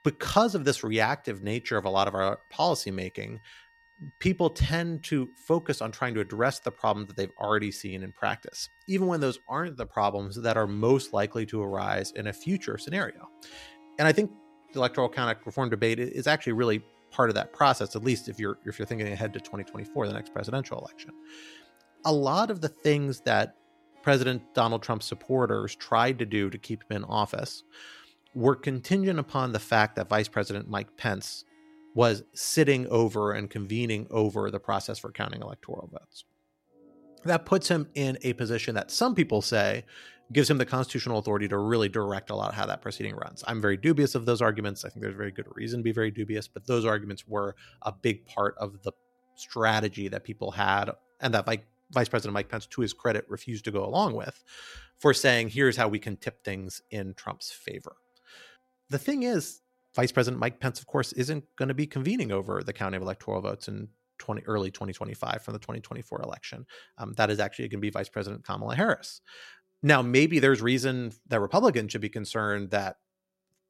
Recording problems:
background music; faint; throughout; 30 dB below the speech

